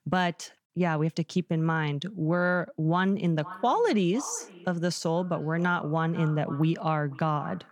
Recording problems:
echo of what is said; faint; from 3.5 s on; 500 ms later, 20 dB below the speech

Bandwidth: 18 kHz